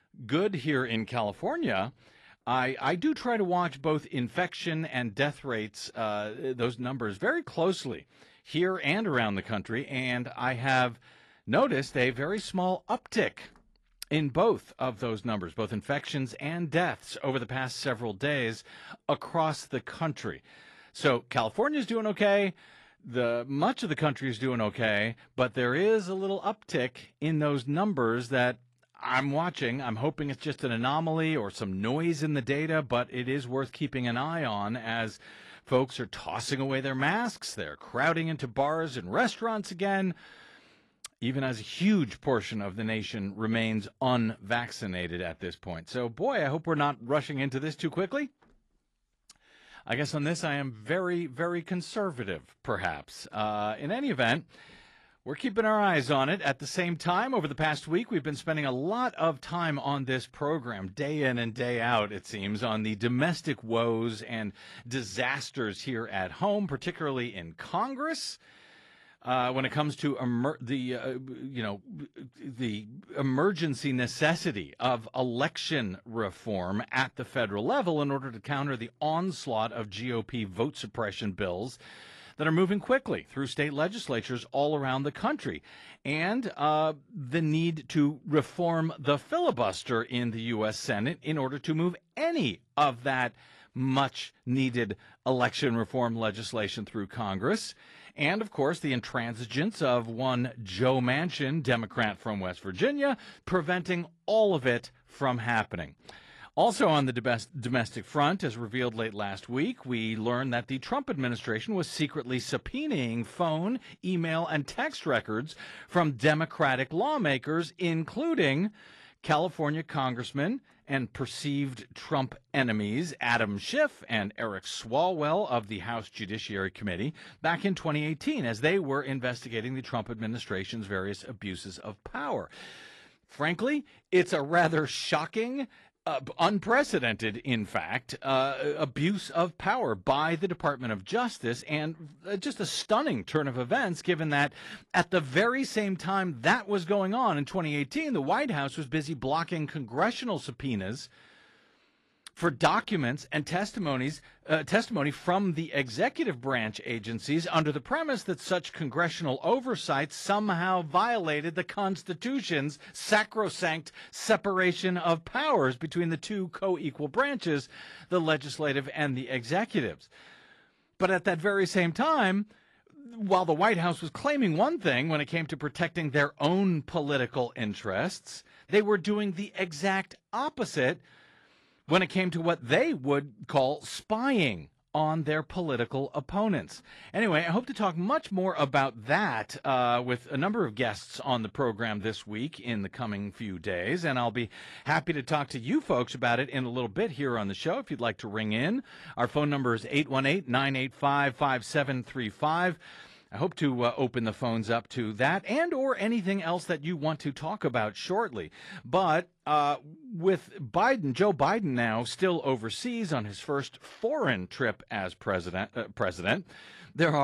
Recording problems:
garbled, watery; slightly; nothing above 11 kHz
abrupt cut into speech; at the end

